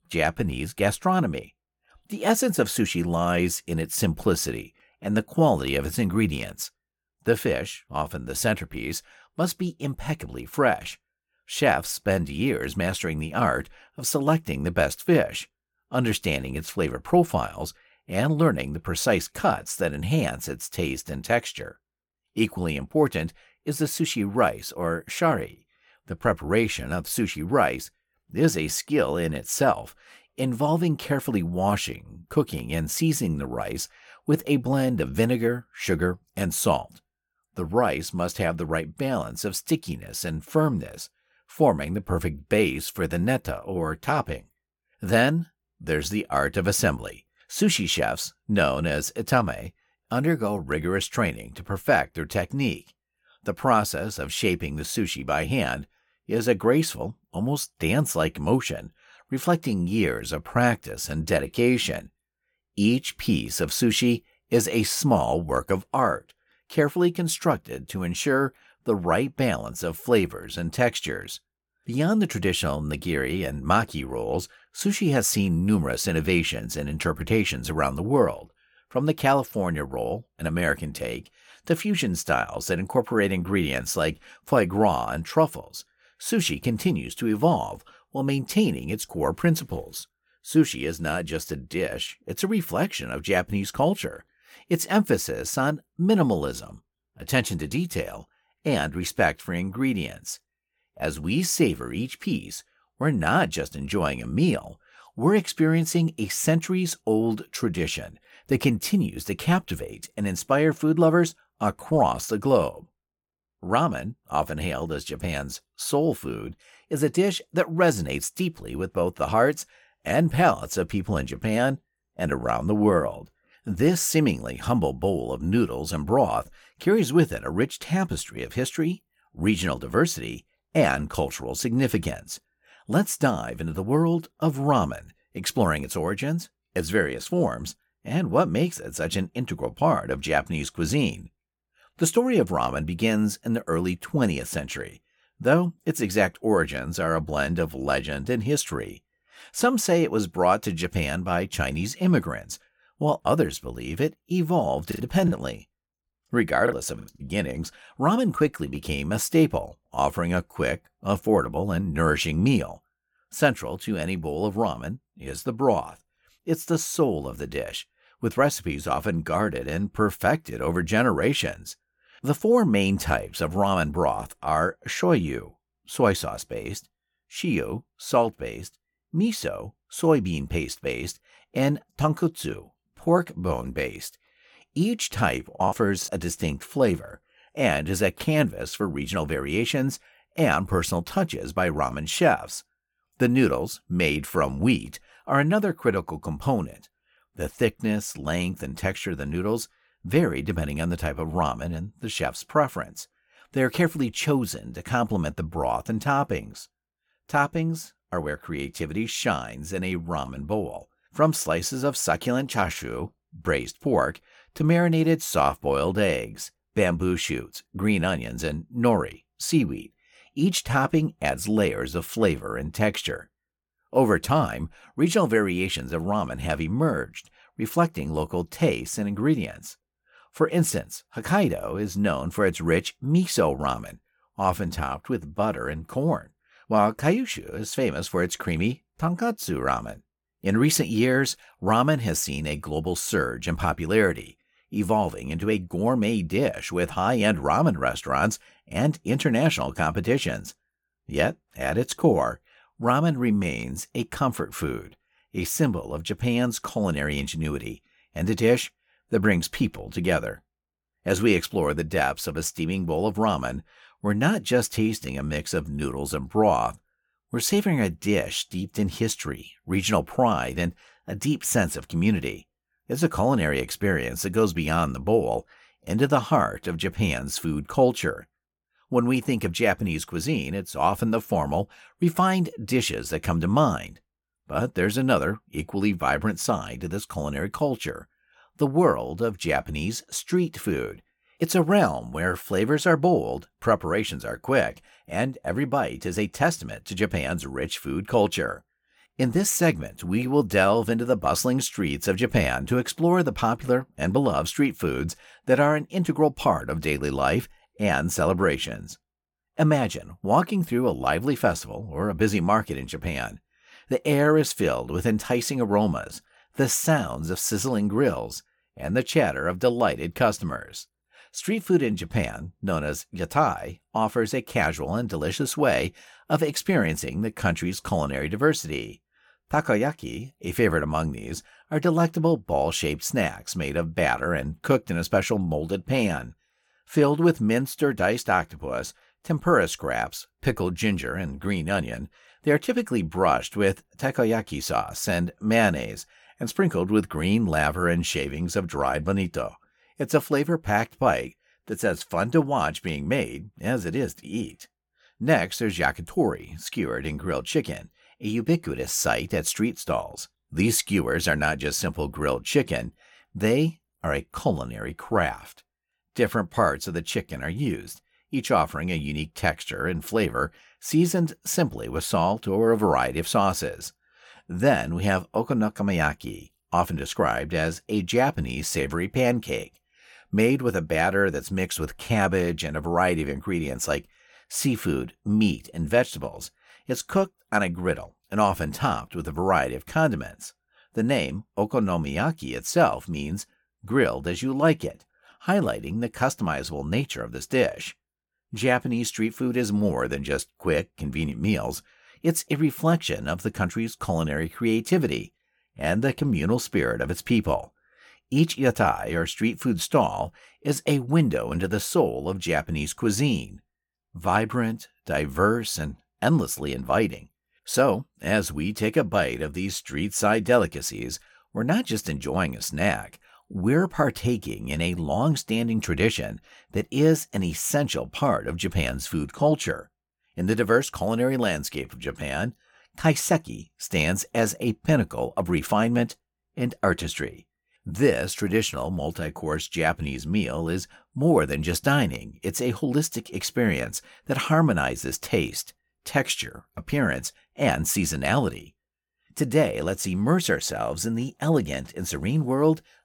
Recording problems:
choppy; very; from 2:35 to 2:37 and at 3:06; 10% of the speech affected

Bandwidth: 17.5 kHz